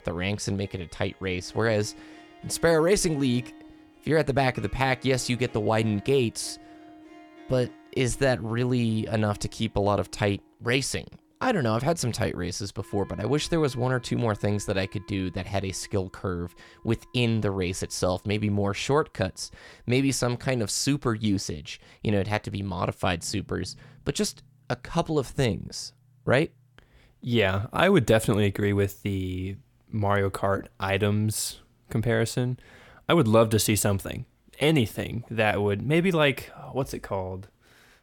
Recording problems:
background music; faint; throughout; 25 dB below the speech

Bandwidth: 17.5 kHz